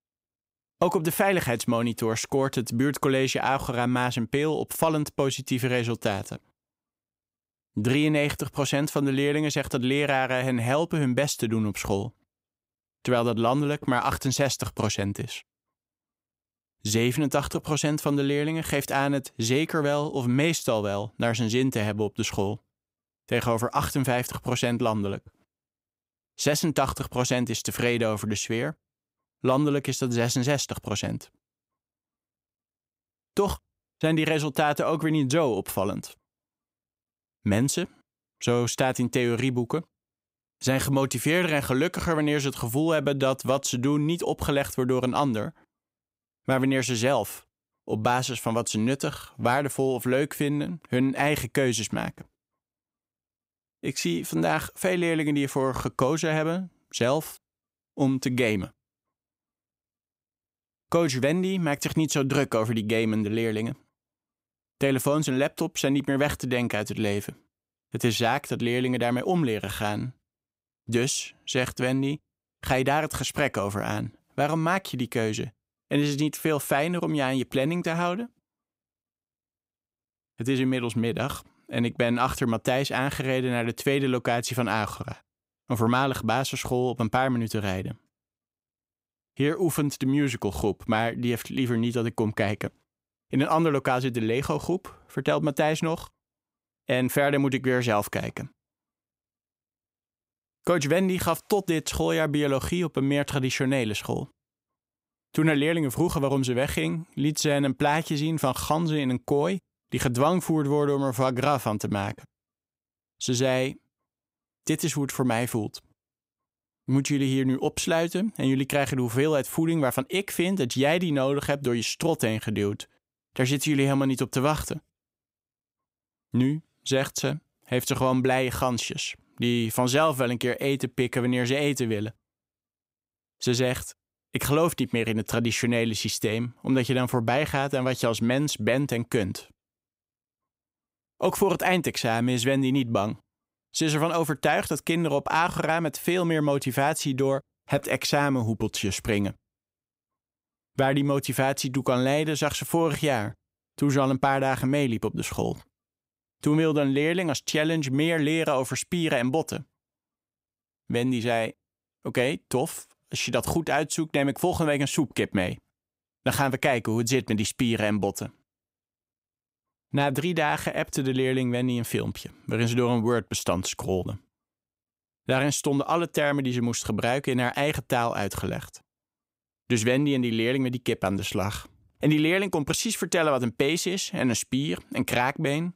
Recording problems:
none

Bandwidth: 15.5 kHz